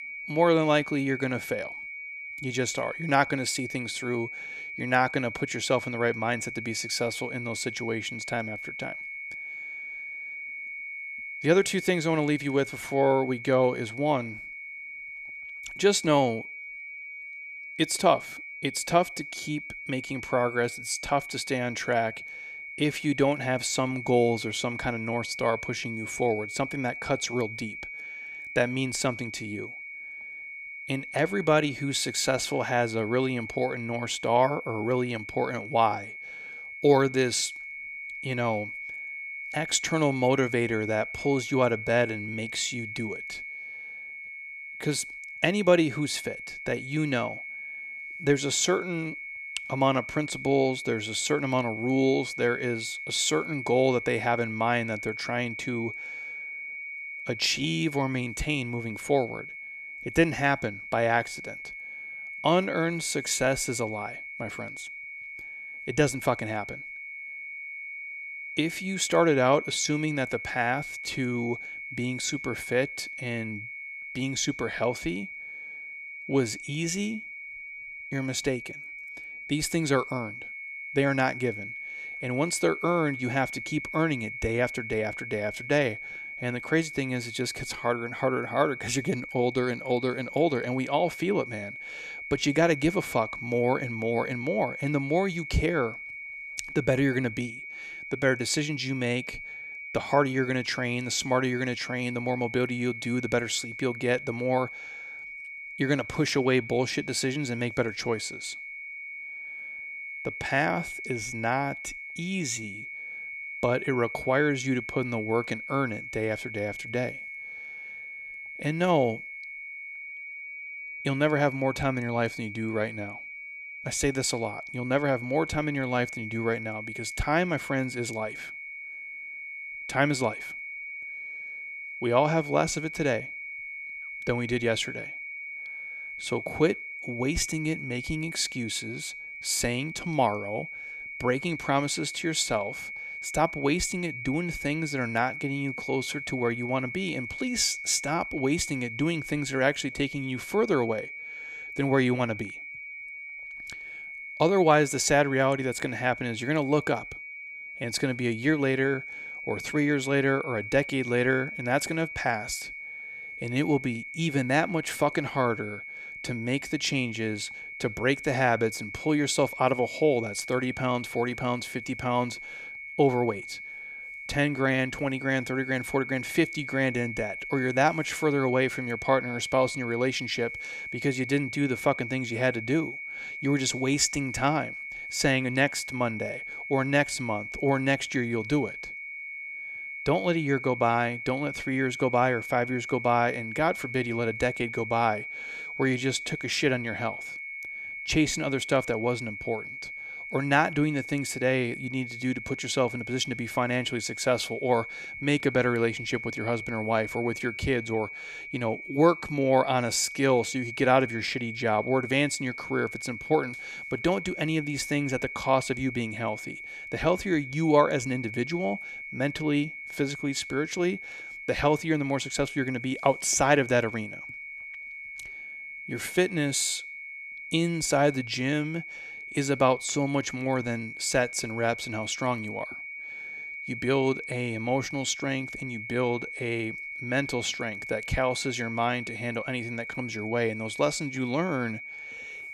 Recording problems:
high-pitched whine; loud; throughout; 2 kHz, 9 dB below the speech

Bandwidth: 14 kHz